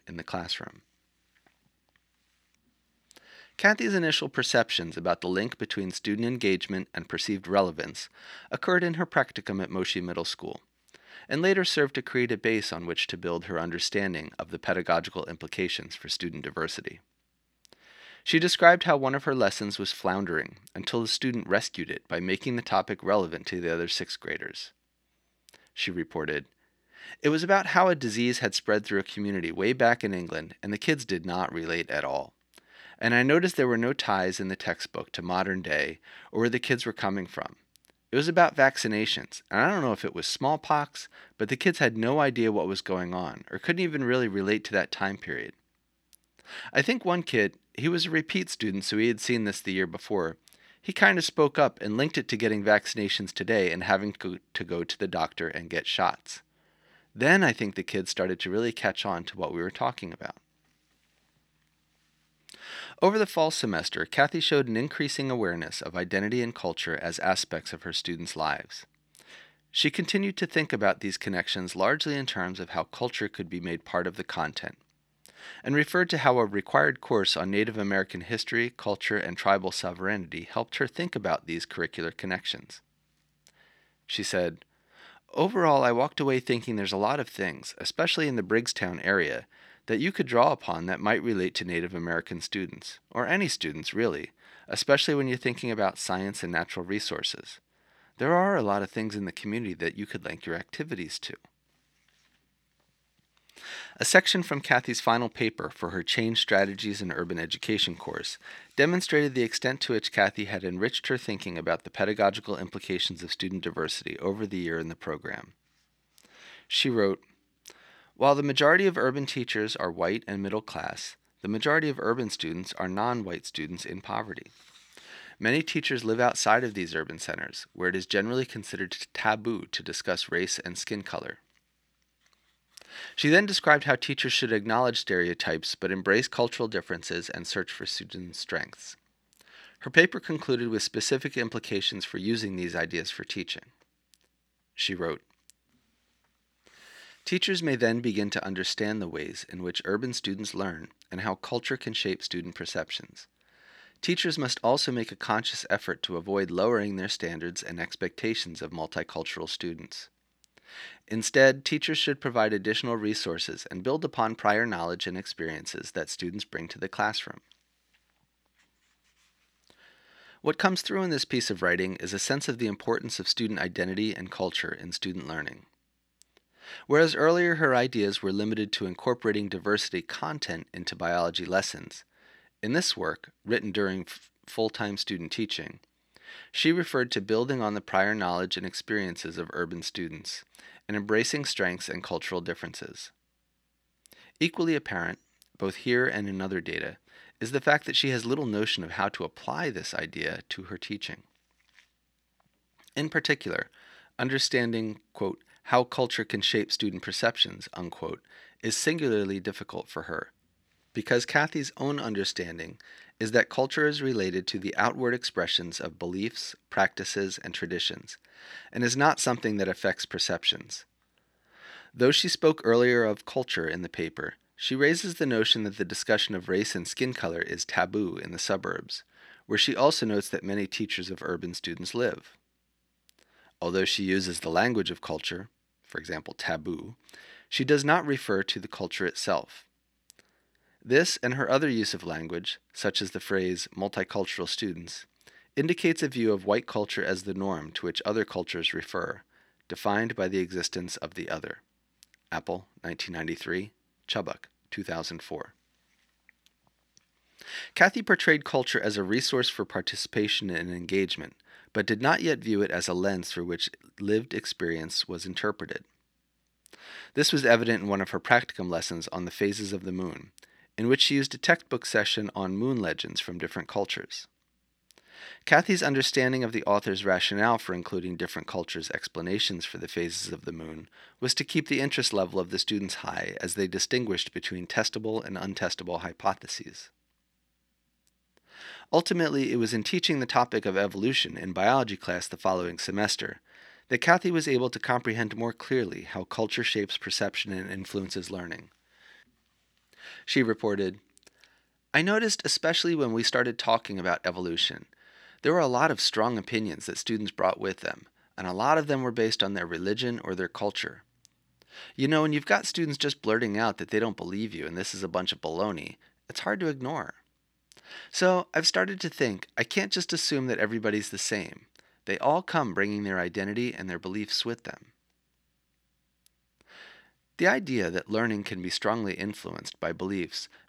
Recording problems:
thin; very slightly; fading below 300 Hz

